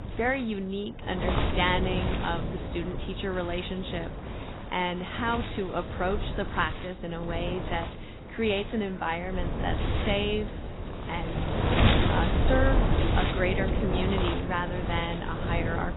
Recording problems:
garbled, watery; badly; nothing above 4 kHz
wind noise on the microphone; heavy; 3 dB below the speech
traffic noise; faint; throughout; 25 dB below the speech

